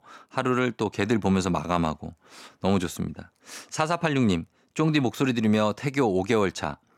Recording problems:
none

